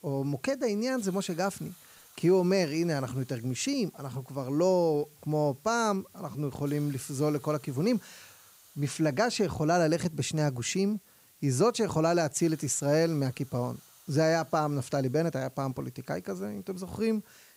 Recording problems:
hiss; faint; throughout; 25 dB below the speech

